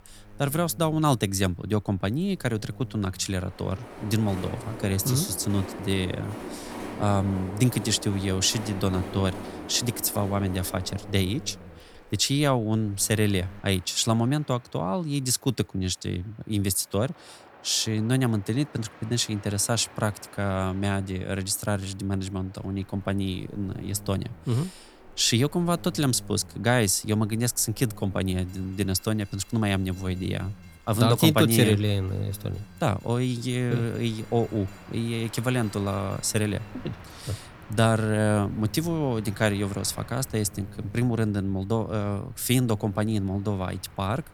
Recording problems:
train or aircraft noise; noticeable; throughout; 20 dB below the speech
electrical hum; very faint; until 14 s and from 23 s on; 50 Hz, 25 dB below the speech

